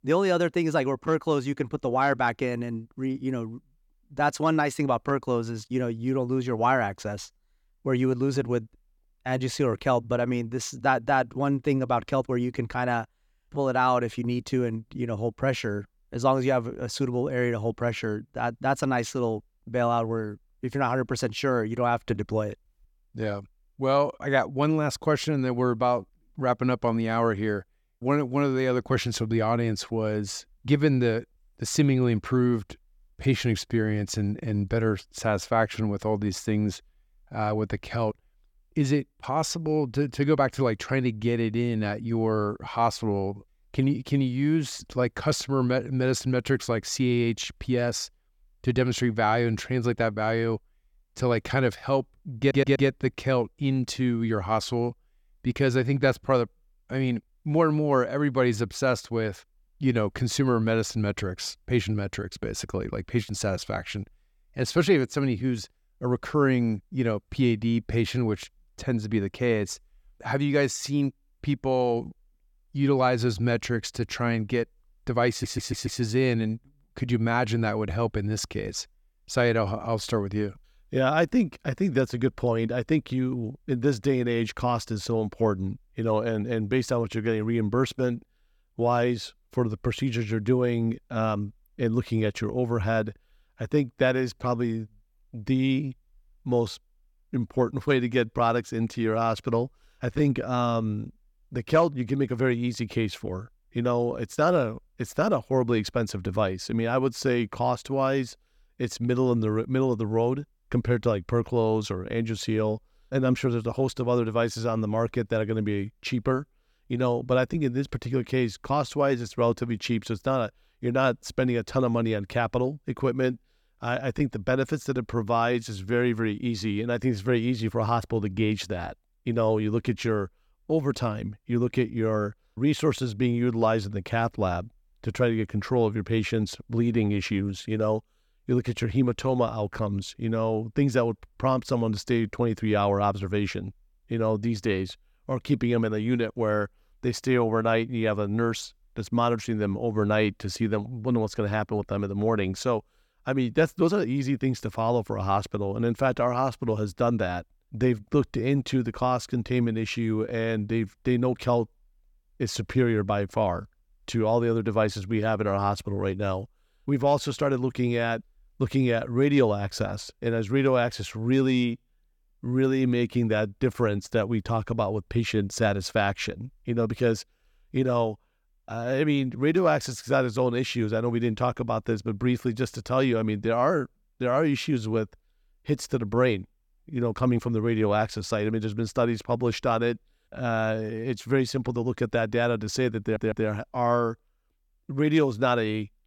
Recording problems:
audio stuttering; at 52 s, at 1:15 and at 3:13

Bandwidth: 17.5 kHz